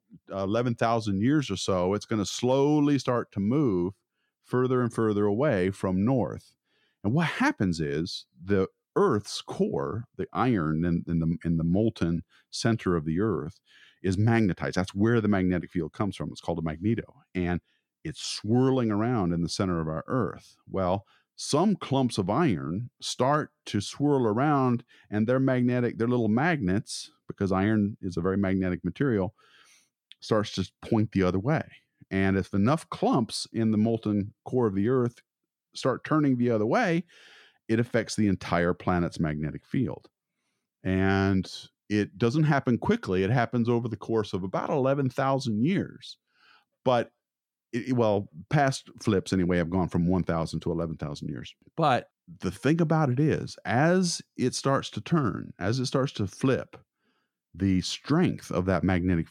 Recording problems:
none

